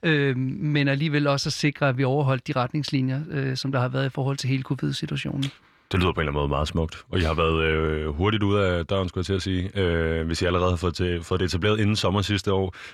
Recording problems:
none

